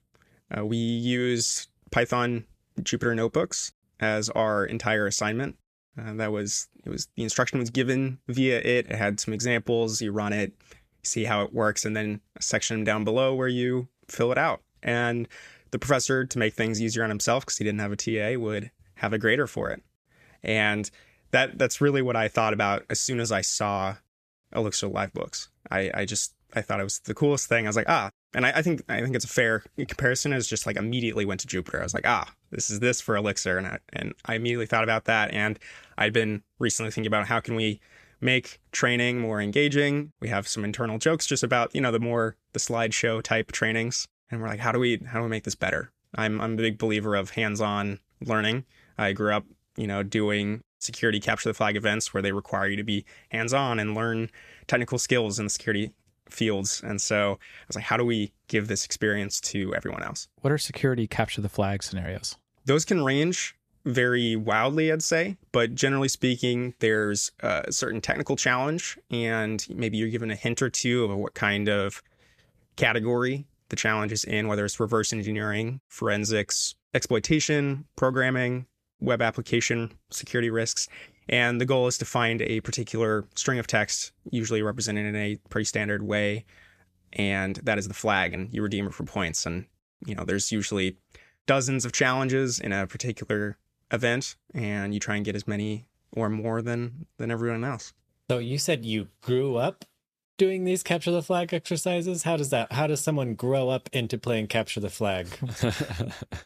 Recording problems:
none

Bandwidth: 14.5 kHz